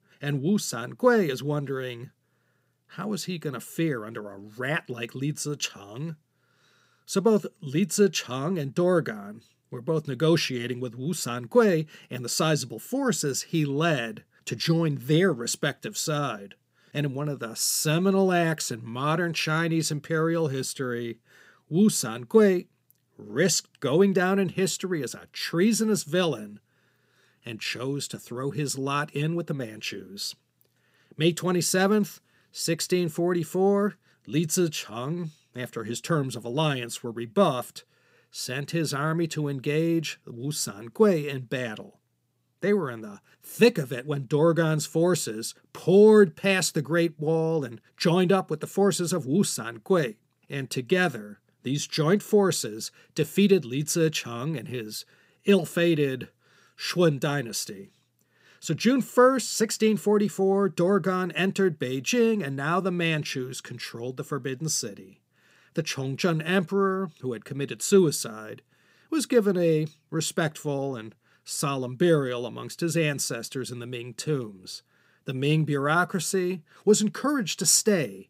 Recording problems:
none

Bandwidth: 15.5 kHz